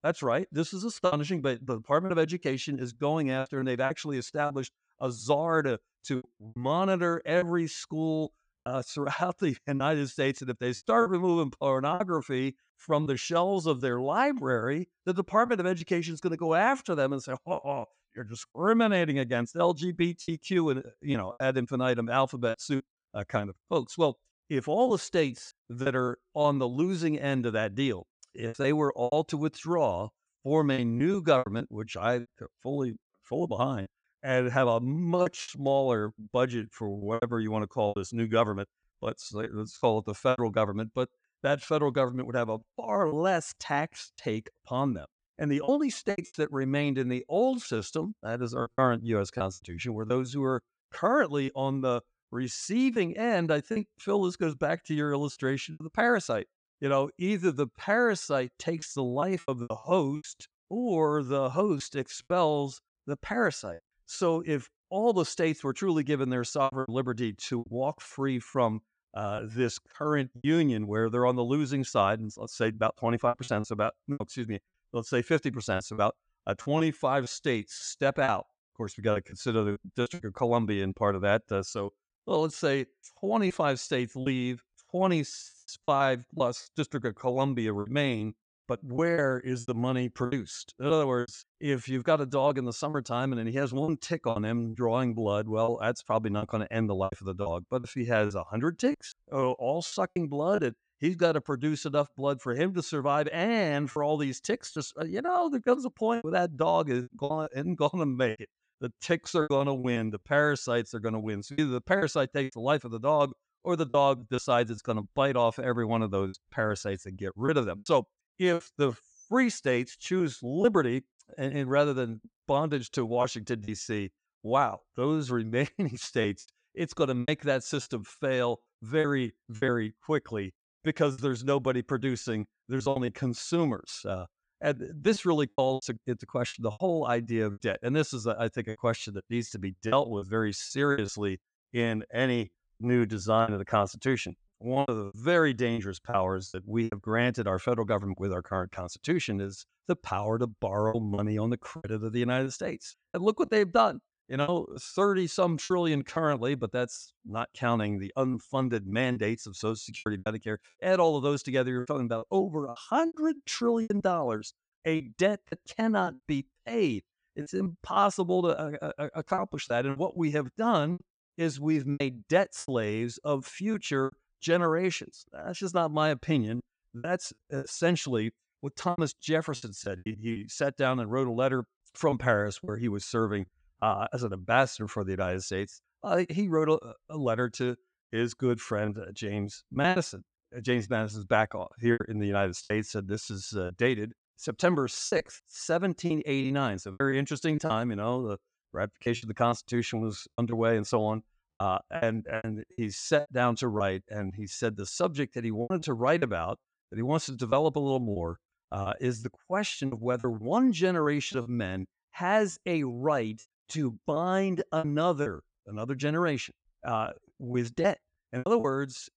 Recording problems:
choppy; very; 7% of the speech affected

